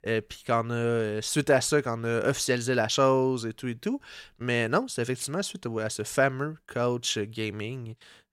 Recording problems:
none

